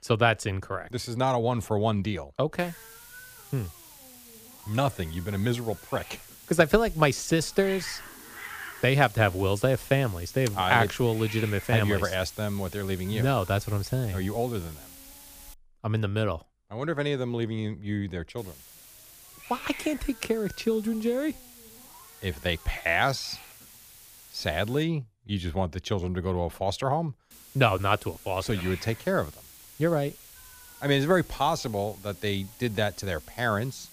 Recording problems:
hiss; noticeable; from 2.5 to 16 s, from 18 to 25 s and from 27 s on; 15 dB below the speech

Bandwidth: 15 kHz